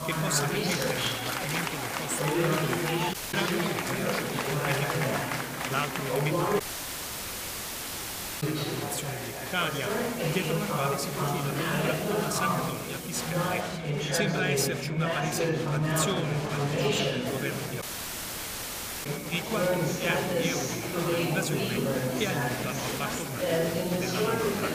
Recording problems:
echo of what is said; noticeable; throughout; 100 ms later, 15 dB below the speech
chatter from many people; very loud; throughout; 5 dB above the speech
hiss; loud; until 14 s and from 17 s on; 7 dB below the speech
electrical hum; faint; throughout; 60 Hz, 25 dB below the speech
audio cutting out; at 3 s, at 6.5 s for 2 s and at 18 s for 1 s

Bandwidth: 15 kHz